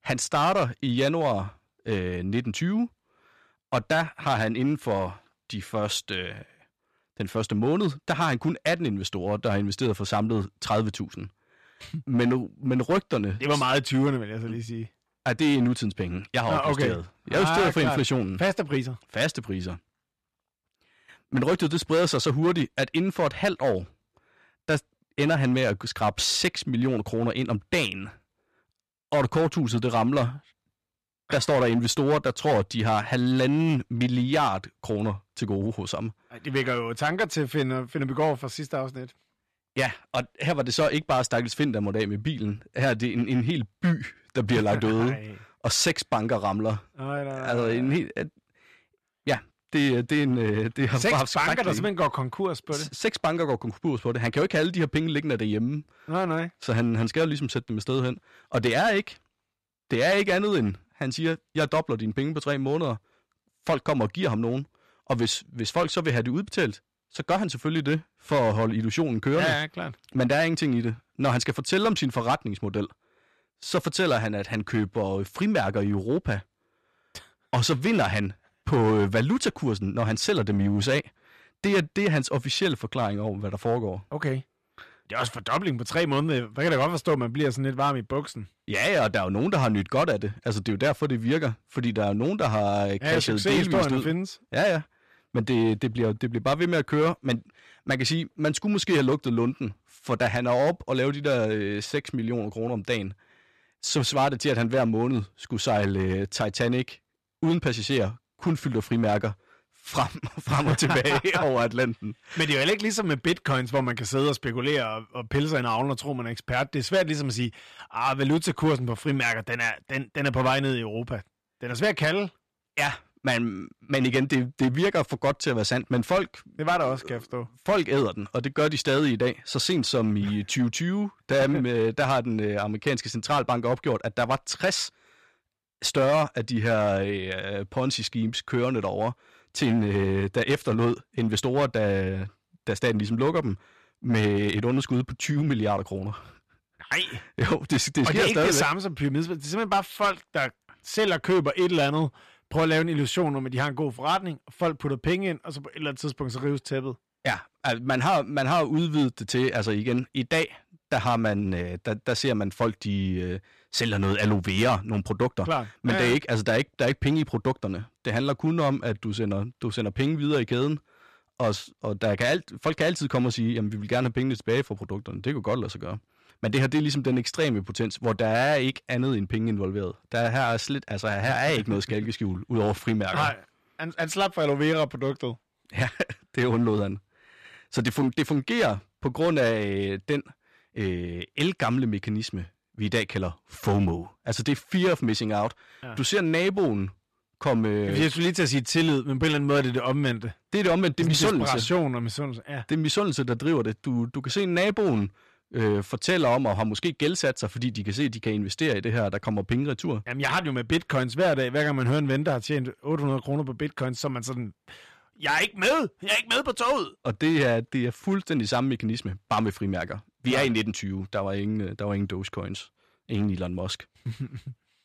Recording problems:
distortion; slight; 5% of the sound clipped

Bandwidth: 14 kHz